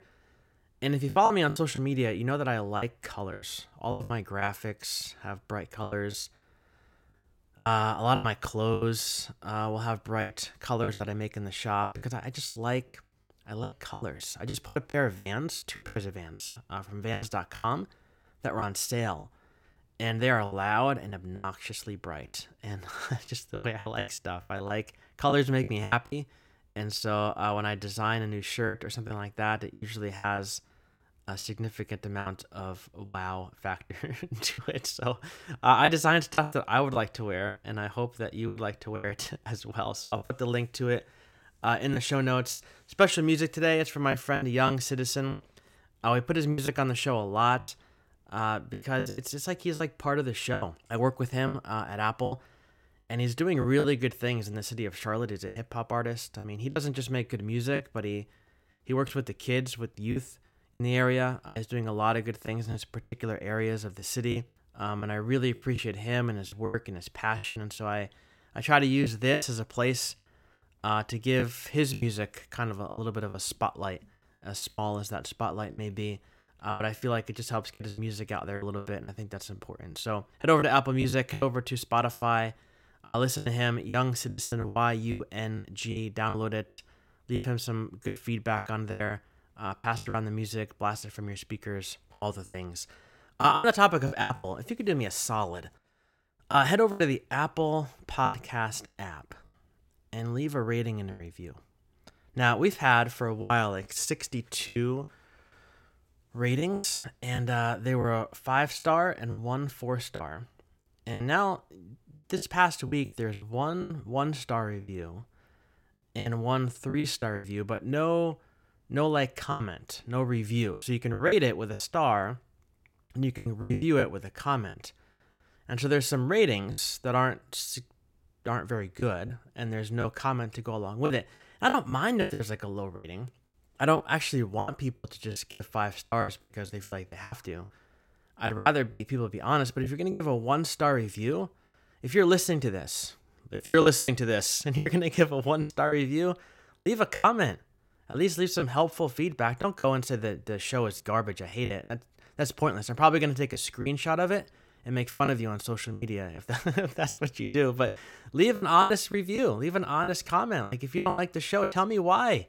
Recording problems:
choppy; very; 11% of the speech affected

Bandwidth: 16.5 kHz